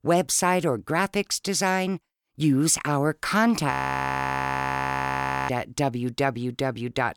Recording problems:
audio freezing; at 3.5 s for 2 s

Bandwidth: 18.5 kHz